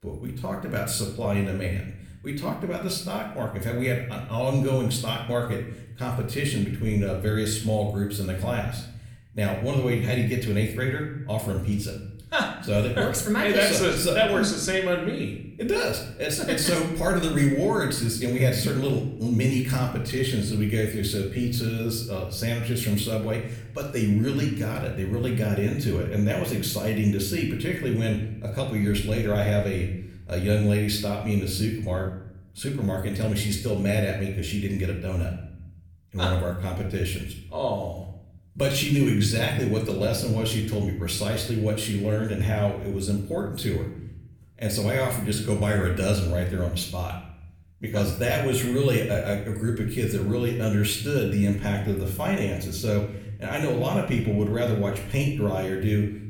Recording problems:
room echo; slight; dies away in 0.7 s
off-mic speech; somewhat distant

